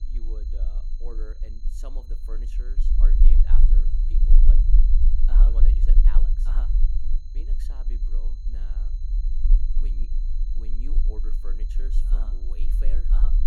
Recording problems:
low rumble; loud; throughout; as loud as the speech
high-pitched whine; noticeable; throughout; 4 kHz, 10 dB below the speech

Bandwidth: 17.5 kHz